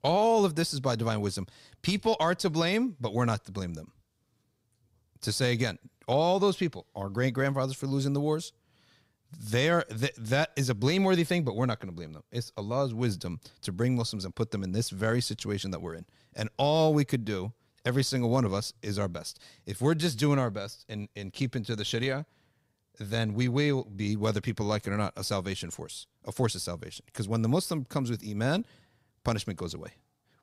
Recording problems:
none

